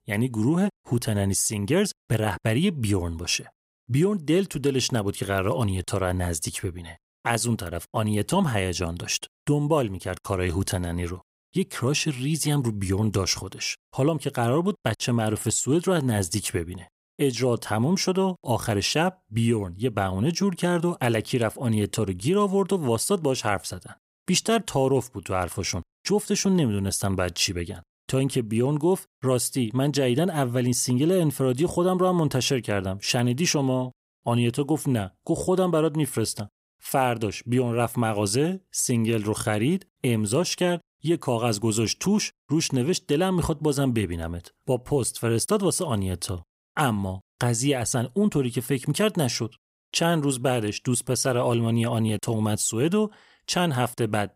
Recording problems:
none

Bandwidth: 15.5 kHz